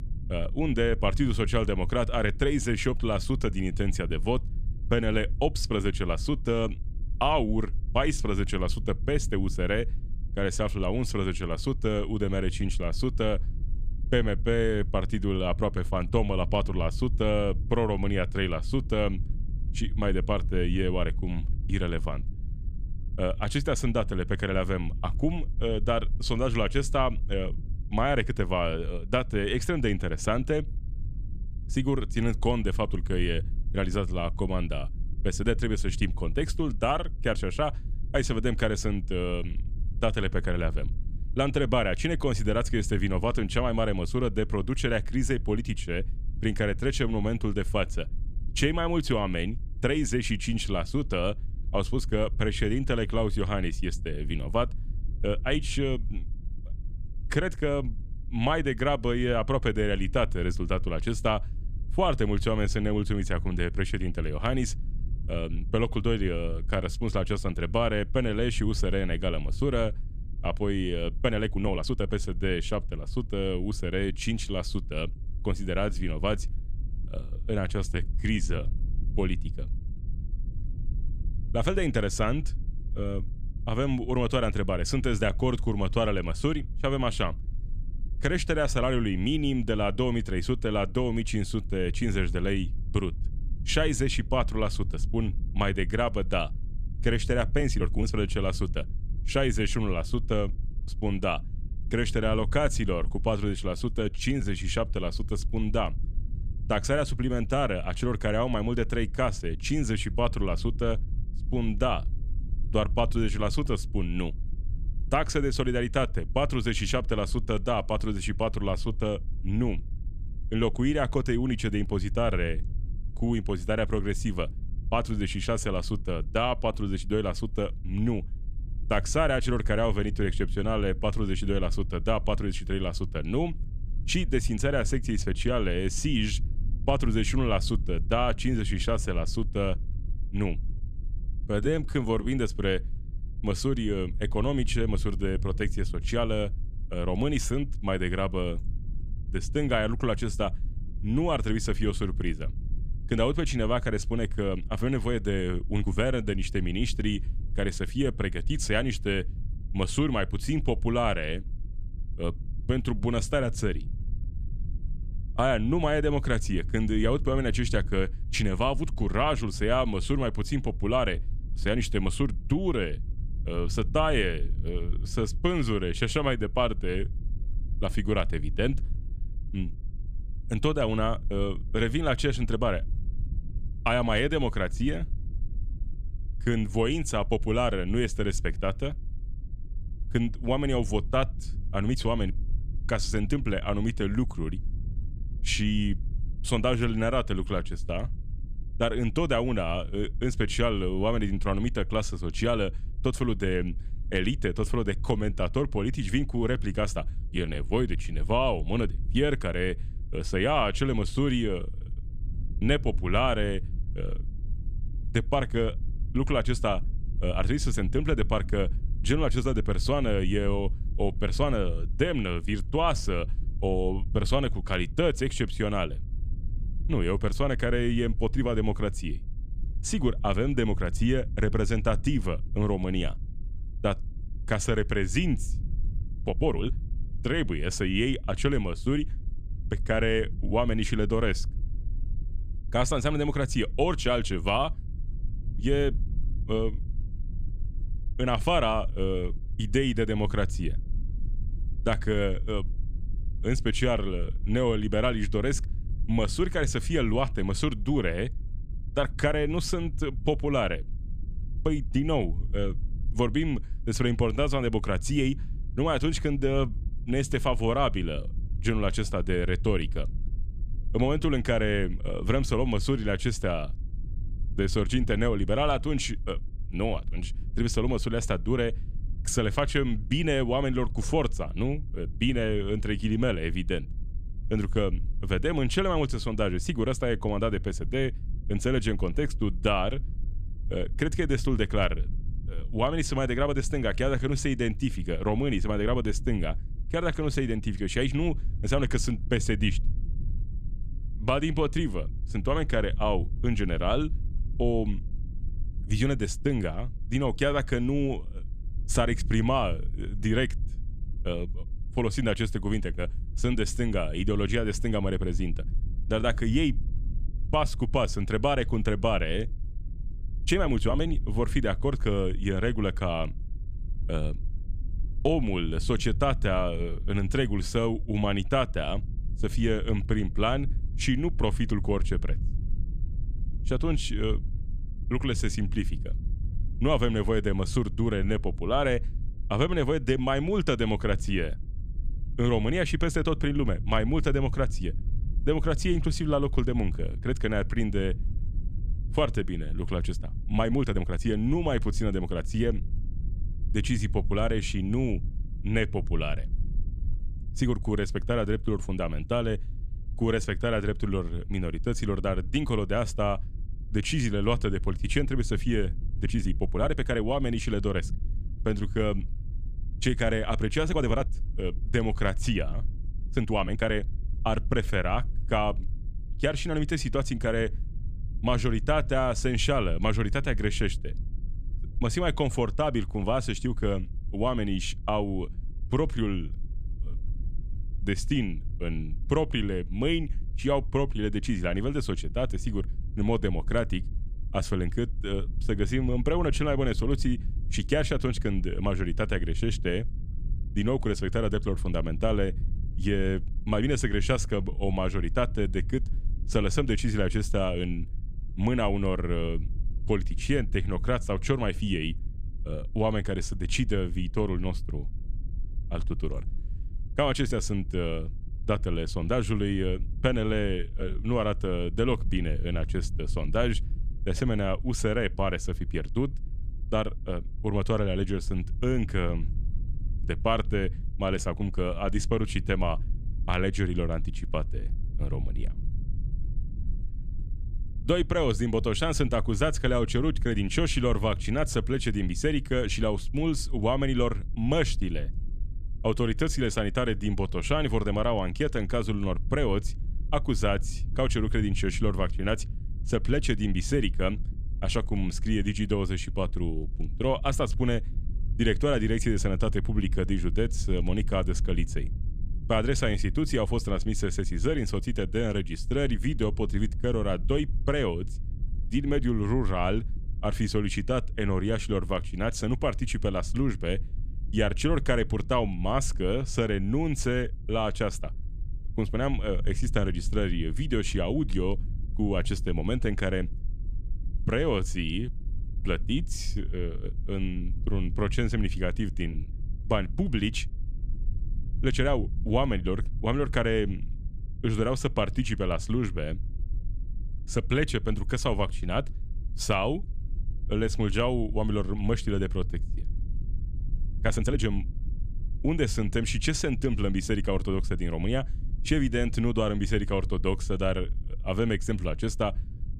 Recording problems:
low rumble; faint; throughout; 25 dB below the speech
uneven, jittery; strongly; from 1:11 to 8:25

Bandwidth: 14.5 kHz